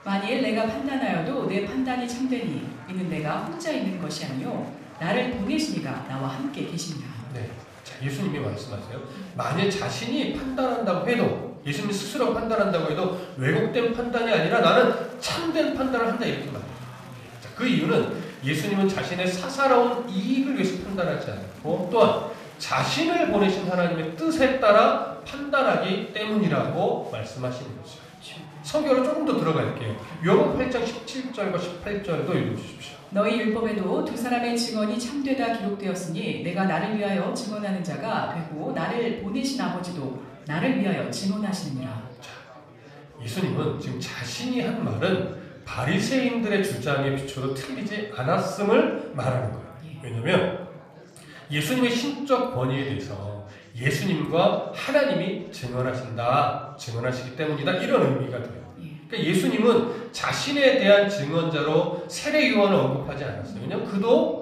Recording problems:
room echo; noticeable; dies away in 0.6 s
off-mic speech; somewhat distant
chatter from many people; faint; throughout; 20 dB below the speech

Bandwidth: 14.5 kHz